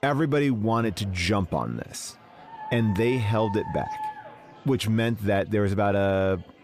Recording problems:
chatter from many people; faint; throughout; 25 dB below the speech
dog barking; noticeable; from 2.5 to 4.5 s; peak 8 dB below the speech

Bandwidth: 15 kHz